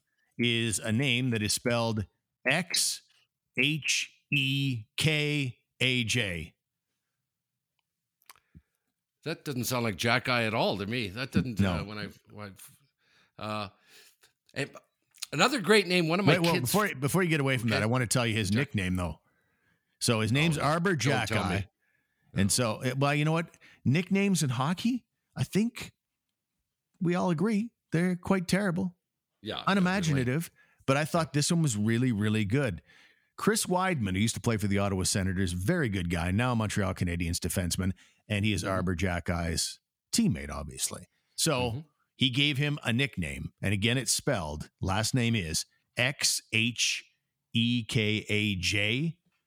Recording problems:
none

